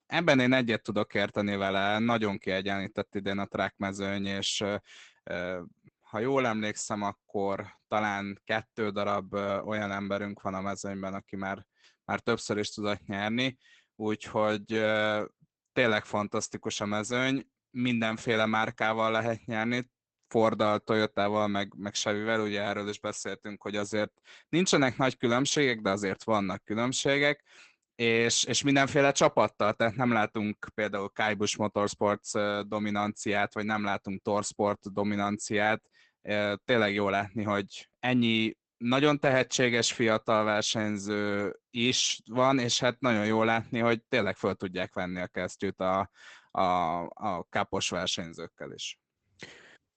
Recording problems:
garbled, watery; badly; nothing above 8 kHz

